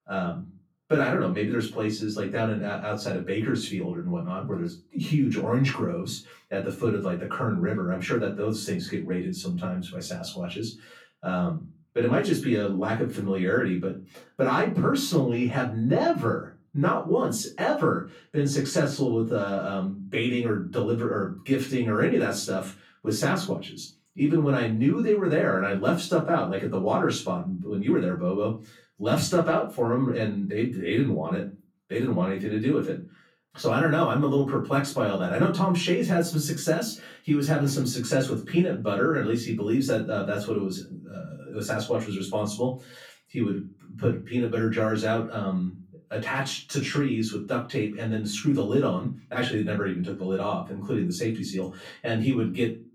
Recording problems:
off-mic speech; far
room echo; slight; dies away in 0.3 s

